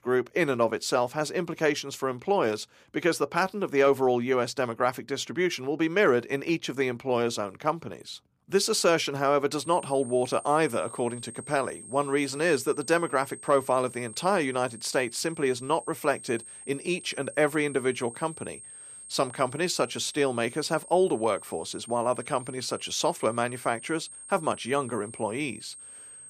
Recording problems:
high-pitched whine; noticeable; from 9.5 s on; 8.5 kHz, 15 dB below the speech

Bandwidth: 15 kHz